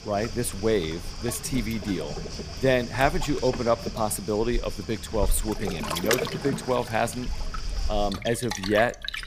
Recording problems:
rain or running water; loud; throughout; 7 dB below the speech

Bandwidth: 15 kHz